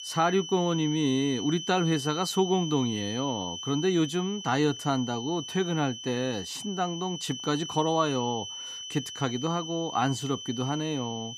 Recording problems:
high-pitched whine; loud; throughout; 3 kHz, 8 dB below the speech

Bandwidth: 14.5 kHz